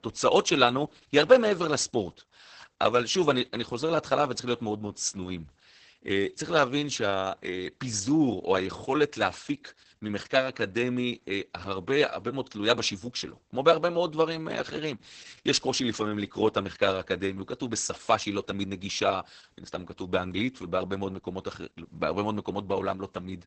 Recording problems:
garbled, watery; badly; nothing above 8 kHz

